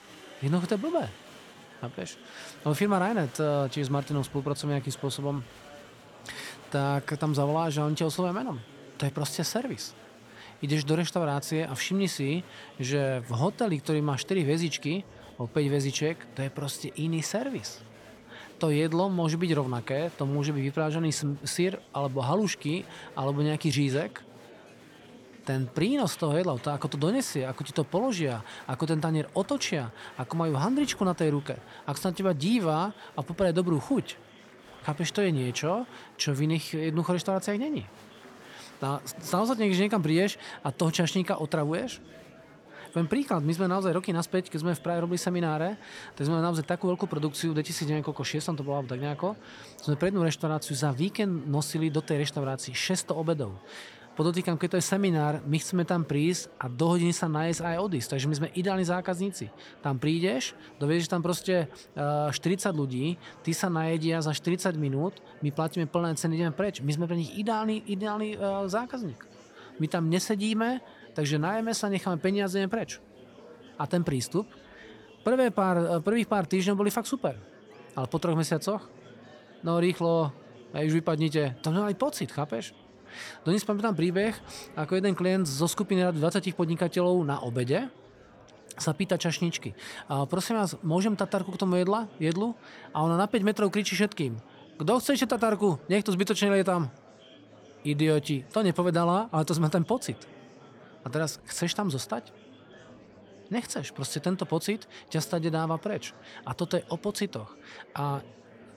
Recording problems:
murmuring crowd; faint; throughout; 20 dB below the speech

